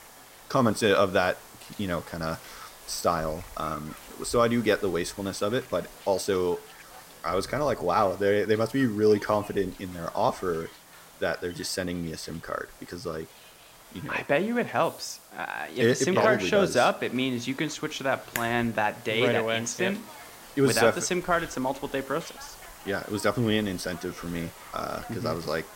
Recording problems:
hiss; noticeable; throughout; 20 dB below the speech

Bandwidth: 16 kHz